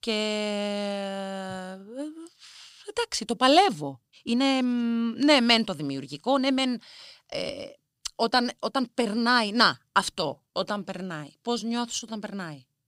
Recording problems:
uneven, jittery; strongly; from 3.5 to 12 s

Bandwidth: 15.5 kHz